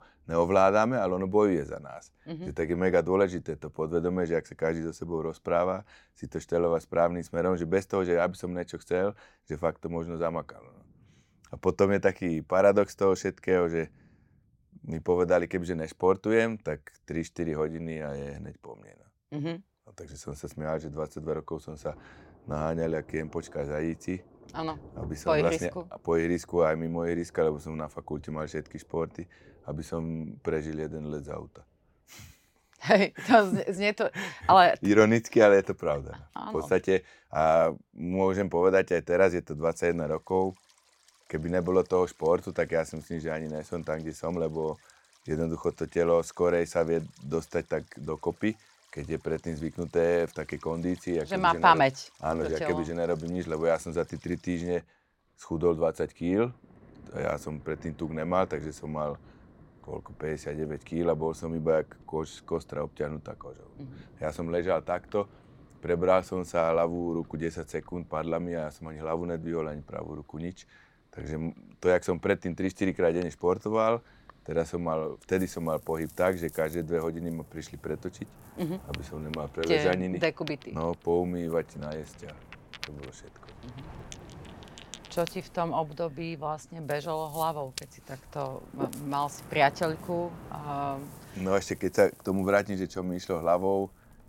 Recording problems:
rain or running water; faint; throughout; 20 dB below the speech

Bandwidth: 16.5 kHz